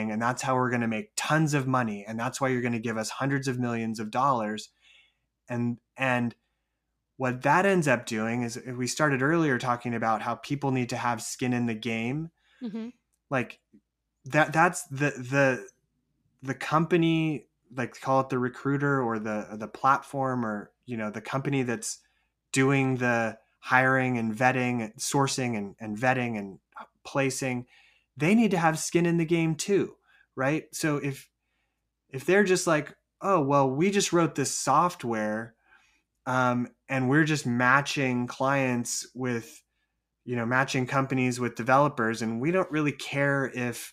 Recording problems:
abrupt cut into speech; at the start

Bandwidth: 14.5 kHz